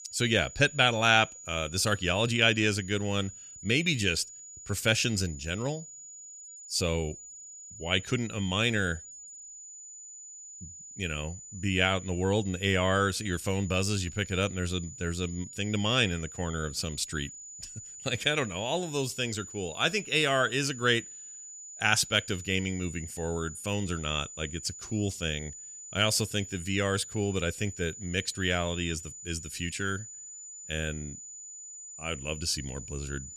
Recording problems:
high-pitched whine; noticeable; throughout; 7 kHz, 15 dB below the speech

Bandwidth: 14.5 kHz